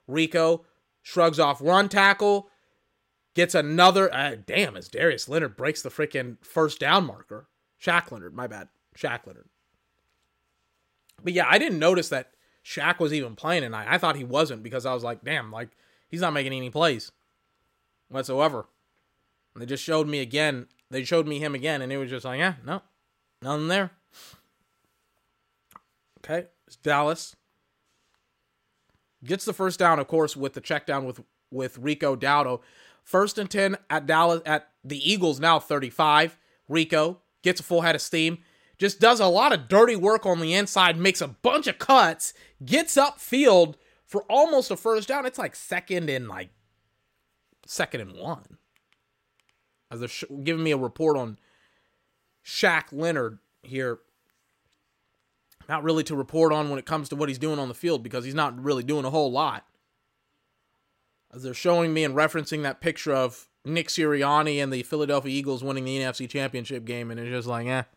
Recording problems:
none

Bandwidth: 16 kHz